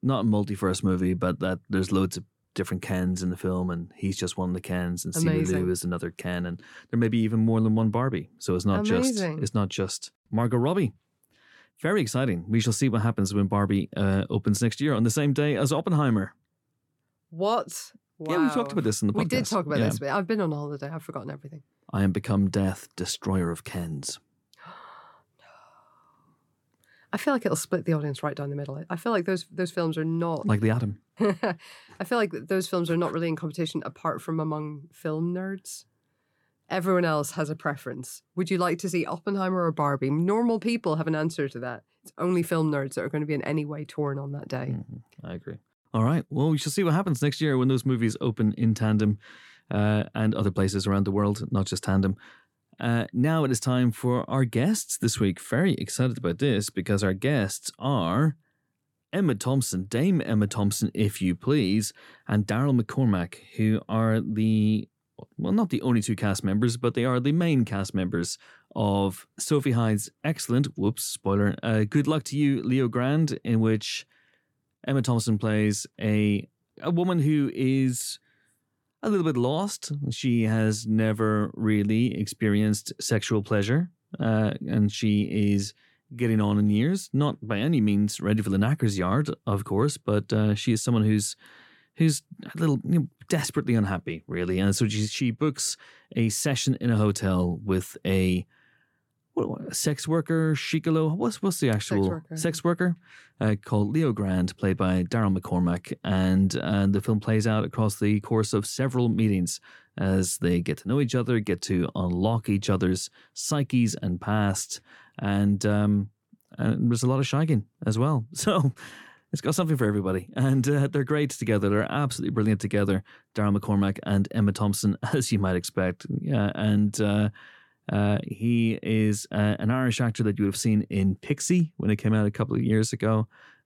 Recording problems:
none

